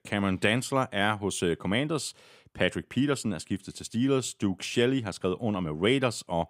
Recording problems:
none

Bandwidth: 15.5 kHz